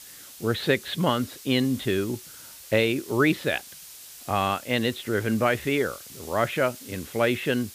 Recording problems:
muffled; very slightly; fading above 3 kHz
hiss; noticeable; throughout; 15 dB below the speech

